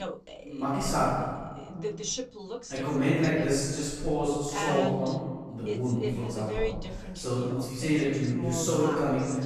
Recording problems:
room echo; strong; dies away in 1.4 s
off-mic speech; far
voice in the background; loud; throughout; 8 dB below the speech

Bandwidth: 13.5 kHz